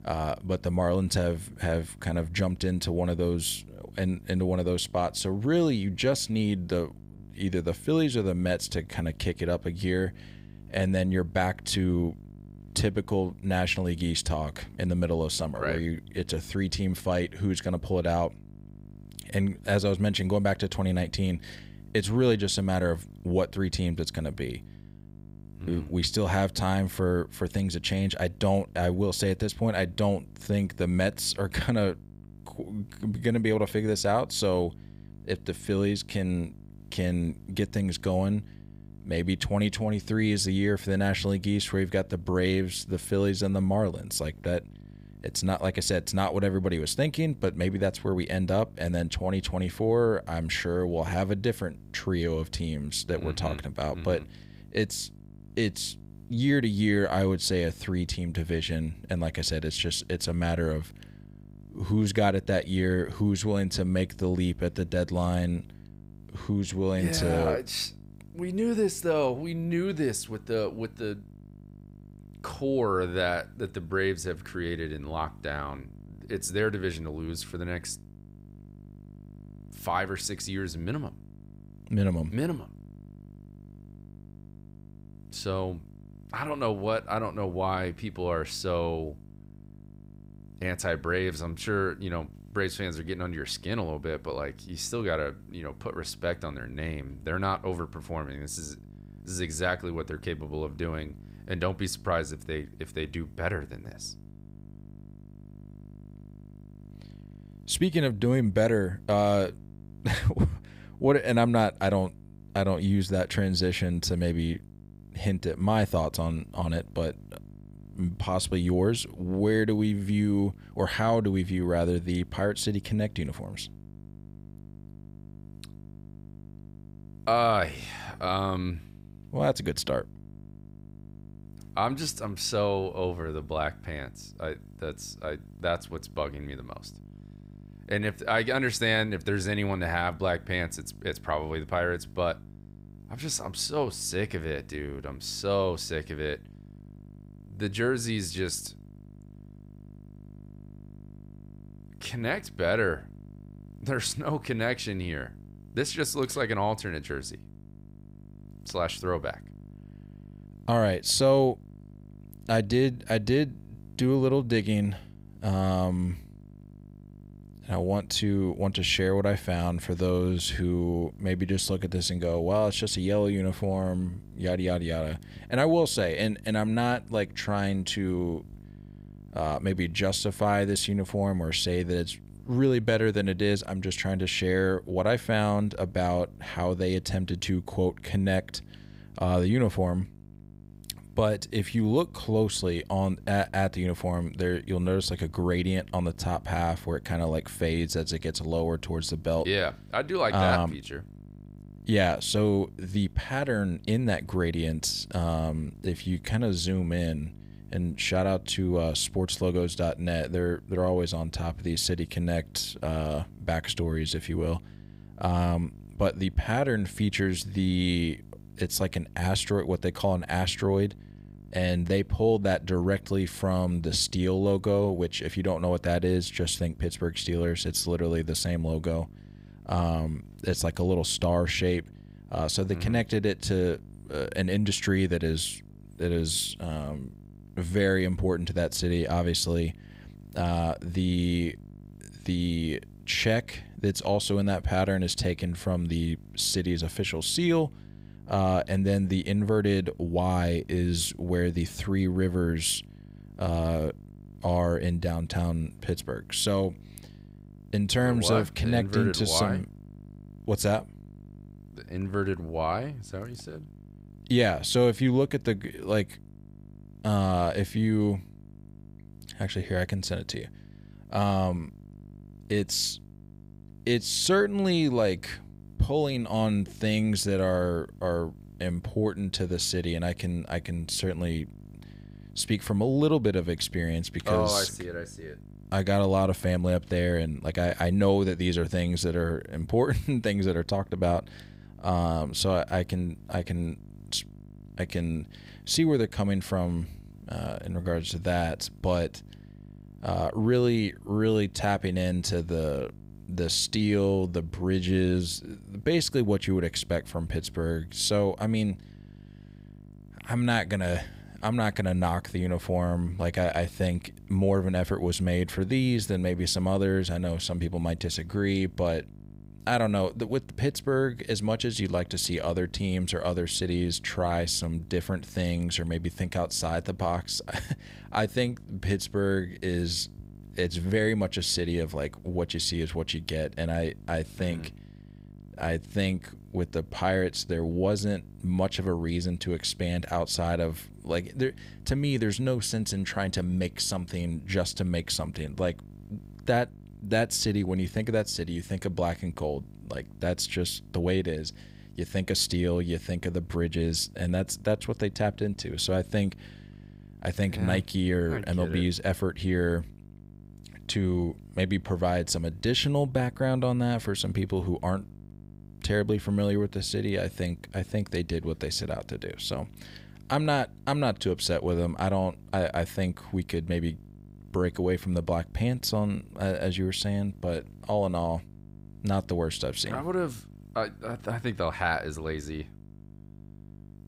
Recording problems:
electrical hum; faint; throughout; 50 Hz, 25 dB below the speech

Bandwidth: 15.5 kHz